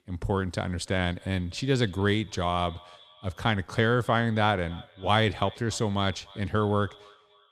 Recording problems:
echo of what is said; faint; throughout; 290 ms later, 25 dB below the speech

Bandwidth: 14.5 kHz